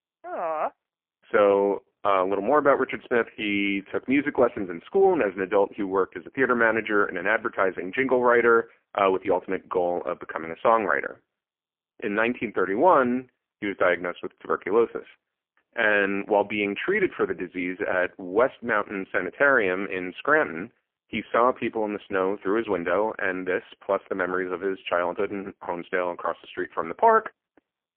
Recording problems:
phone-call audio; poor line; nothing above 3 kHz

